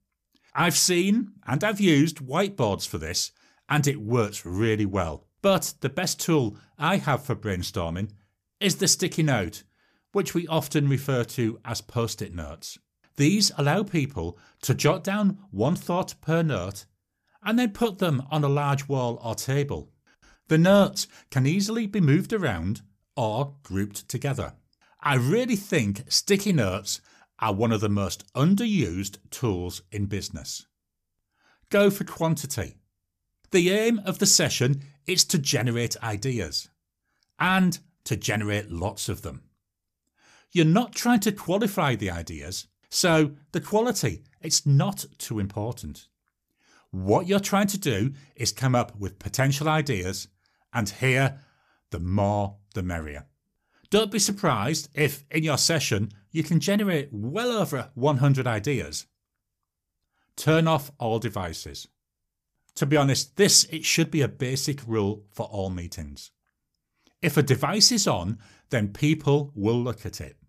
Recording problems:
none

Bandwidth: 14.5 kHz